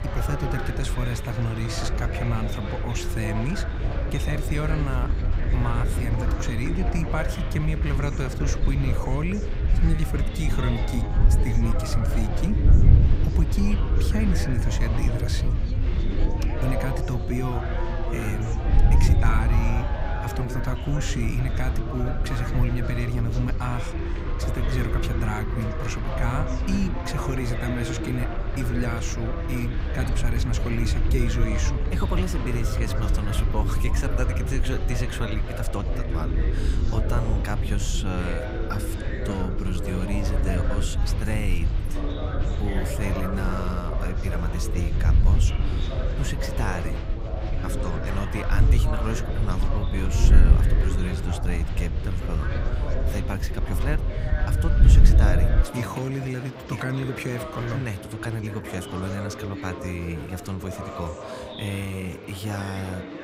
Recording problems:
wind noise on the microphone; heavy; until 56 s; 9 dB below the speech
chatter from many people; loud; throughout; 5 dB below the speech

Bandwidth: 15.5 kHz